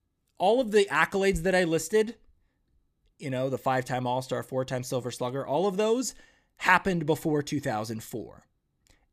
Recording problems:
none

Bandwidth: 15 kHz